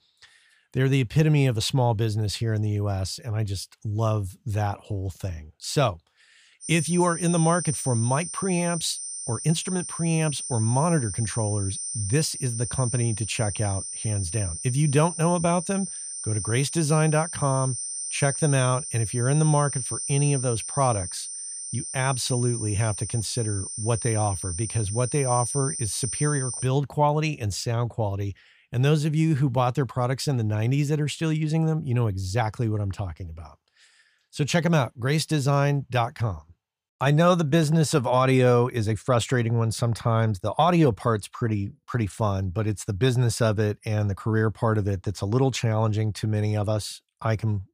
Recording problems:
high-pitched whine; loud; from 6.5 to 27 s; 9 kHz, 6 dB below the speech

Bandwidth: 15 kHz